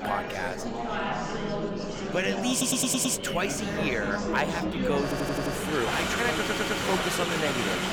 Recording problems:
murmuring crowd; loud; throughout; 1 dB below the speech
train or aircraft noise; noticeable; from 3.5 s on; 15 dB below the speech
audio stuttering; at 2.5 s, at 5 s and at 6.5 s

